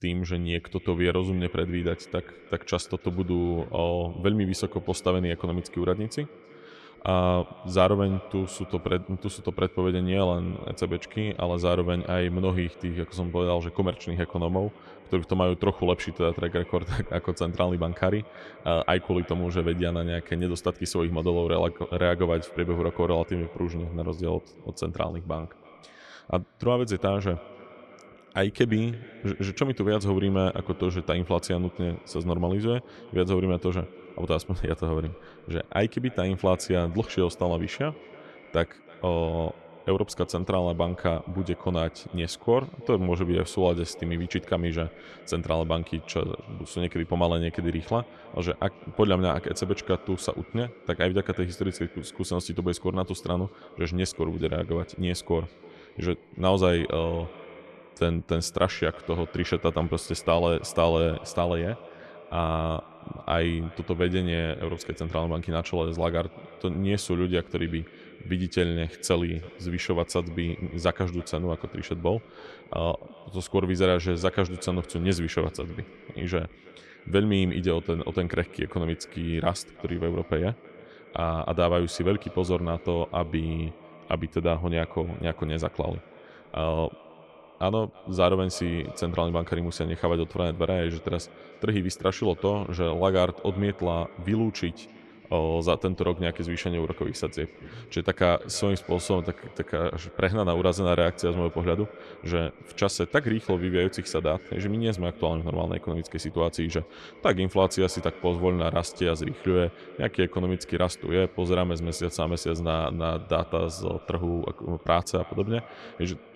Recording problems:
echo of what is said; faint; throughout; 320 ms later, 20 dB below the speech

